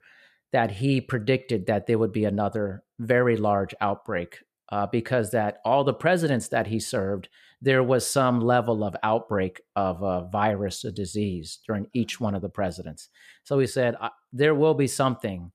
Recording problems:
none

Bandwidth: 14.5 kHz